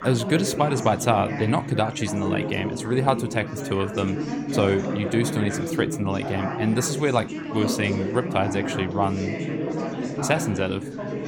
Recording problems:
chatter from many people; loud; throughout; 4 dB below the speech

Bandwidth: 17 kHz